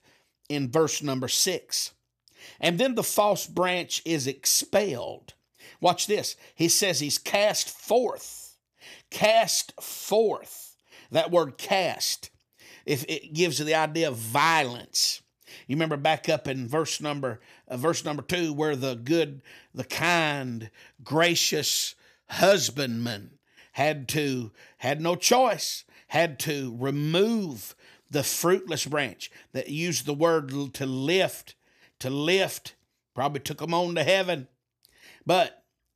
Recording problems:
none

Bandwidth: 14.5 kHz